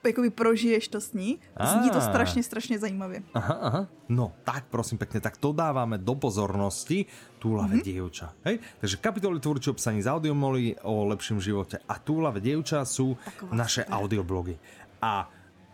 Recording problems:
murmuring crowd; faint; throughout; 25 dB below the speech

